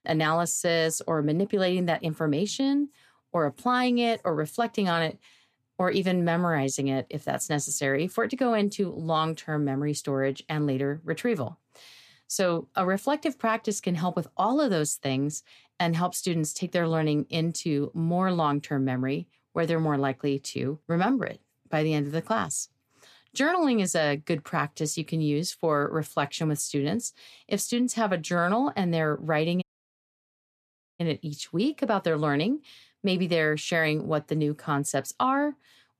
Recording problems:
audio cutting out; at 30 s for 1.5 s

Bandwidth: 14.5 kHz